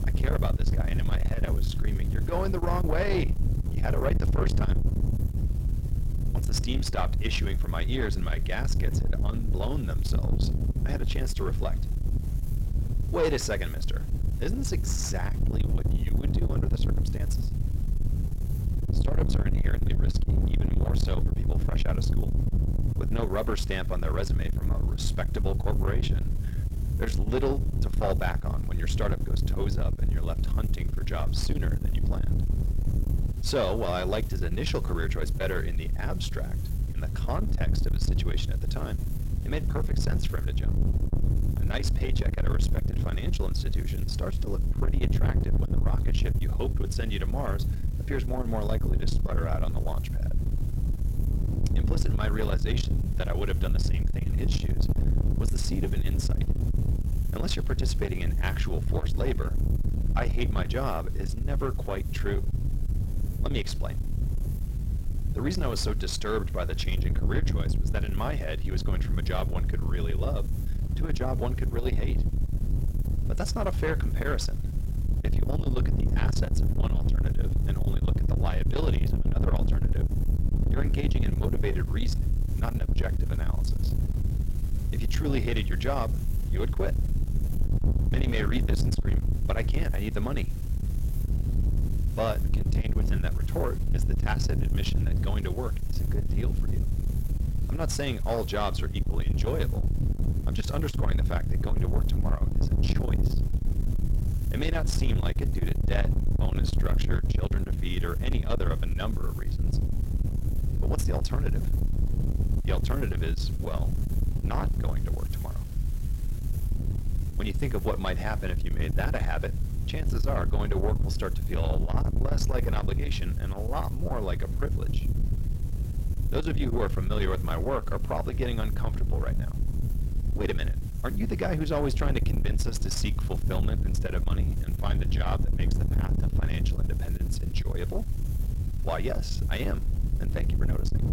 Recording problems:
distortion; slight; 10 dB below the speech
wind noise on the microphone; heavy; 7 dB below the speech
hiss; noticeable; throughout; 20 dB below the speech

